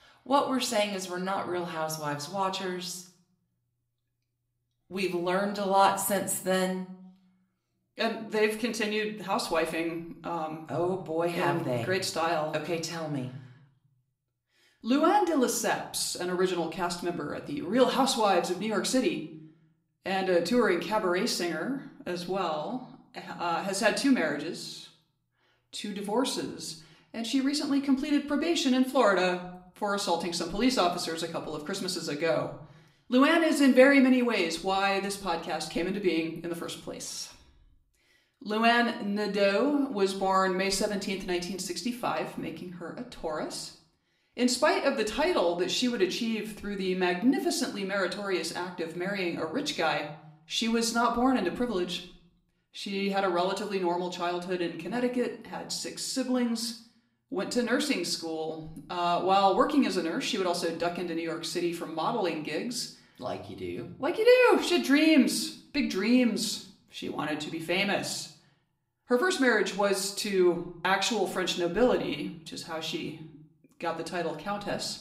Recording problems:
room echo; slight; dies away in 0.5 s
off-mic speech; somewhat distant

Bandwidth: 15.5 kHz